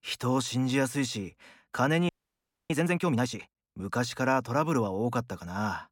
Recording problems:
audio freezing; at 2 s for 0.5 s

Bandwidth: 17 kHz